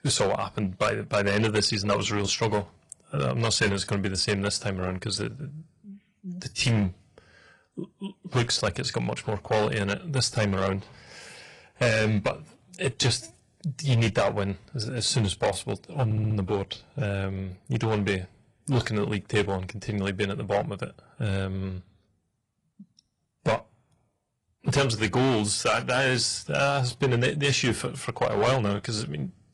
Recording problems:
distortion; heavy; 5% of the sound clipped
garbled, watery; slightly
audio stuttering; at 16 s

